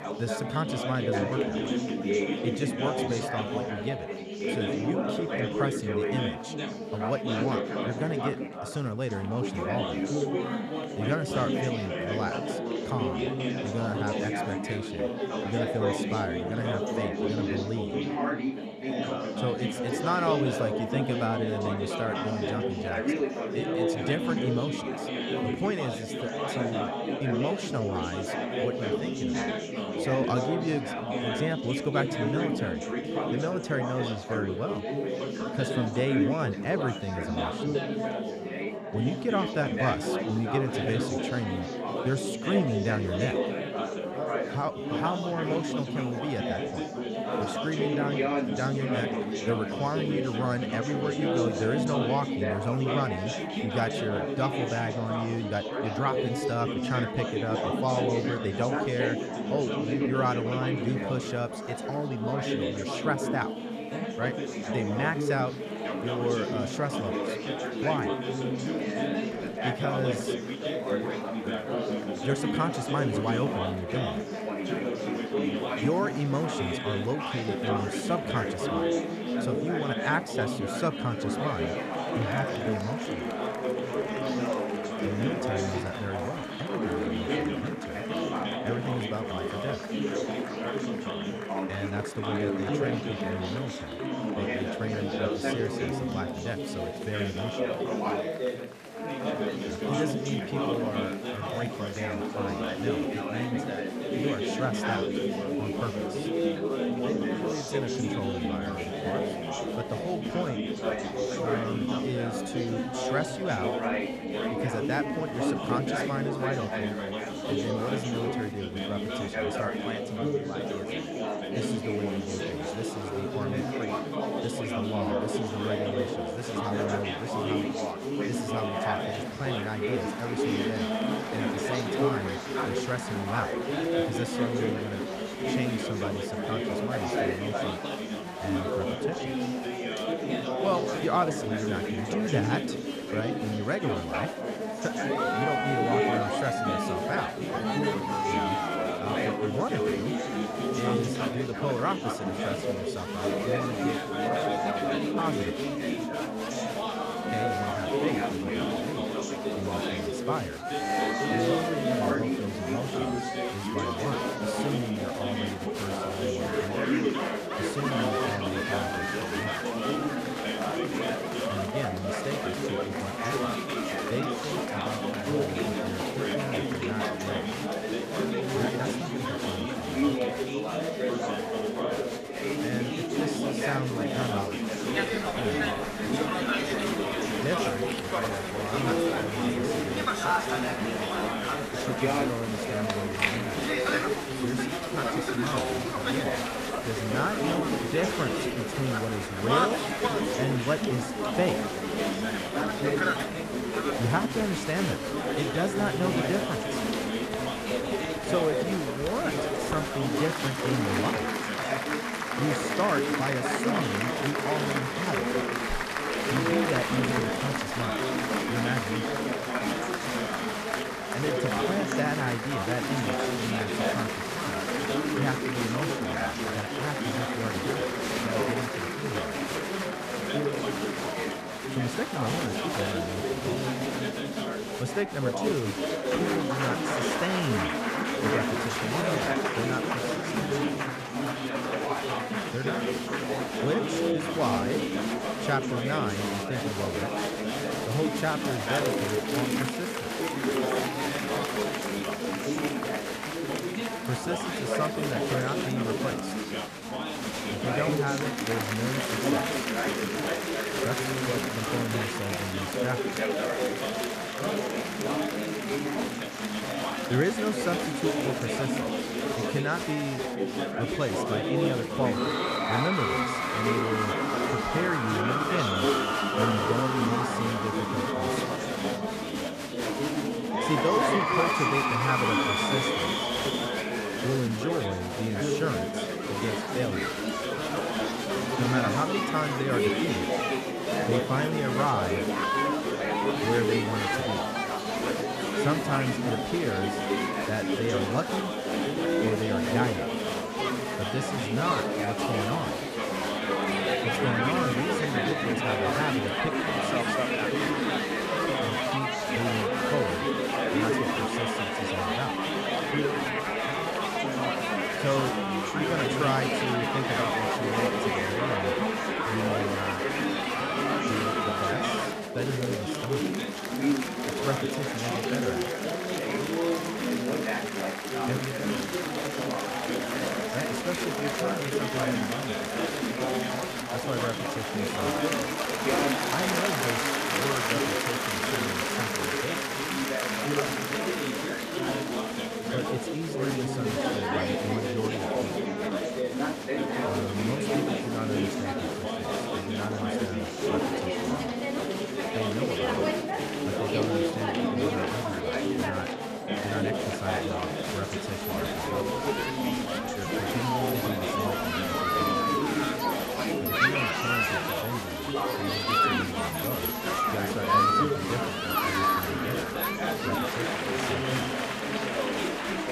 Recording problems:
chatter from many people; very loud; throughout; 4 dB above the speech

